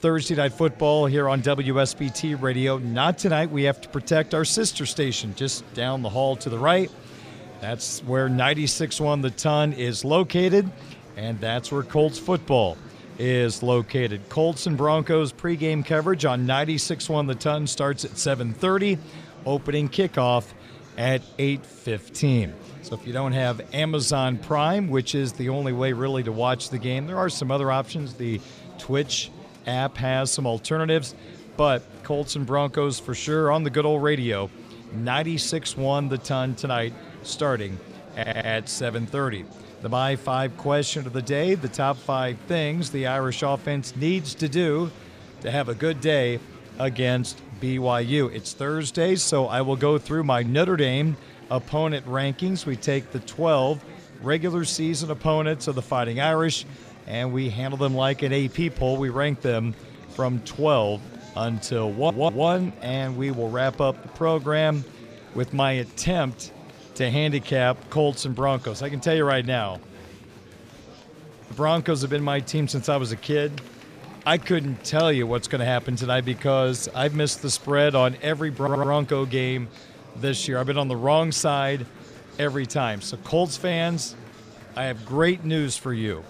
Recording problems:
murmuring crowd; noticeable; throughout; 20 dB below the speech
audio stuttering; at 38 s, at 1:02 and at 1:19

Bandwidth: 15 kHz